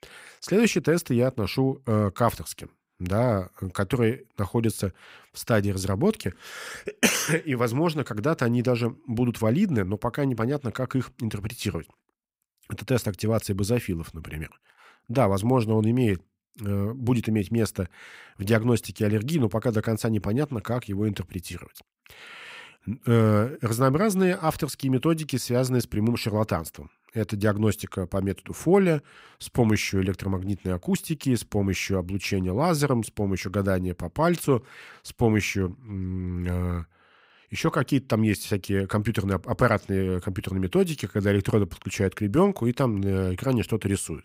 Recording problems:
none

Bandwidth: 15.5 kHz